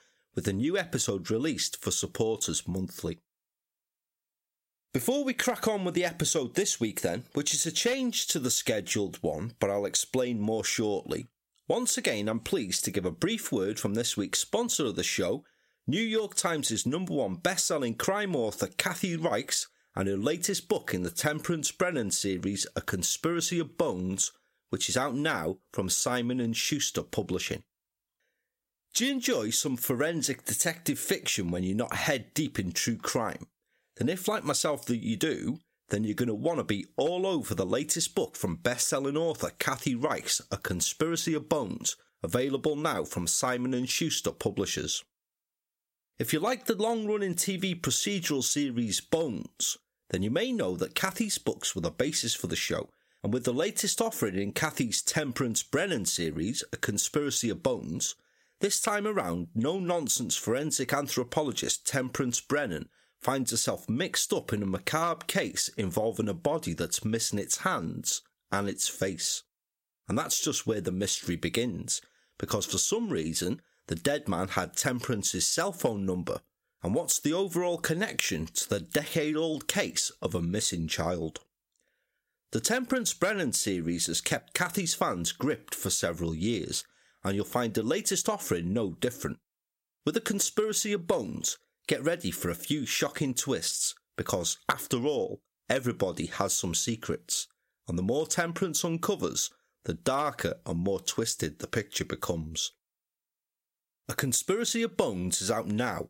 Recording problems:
squashed, flat; somewhat

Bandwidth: 16 kHz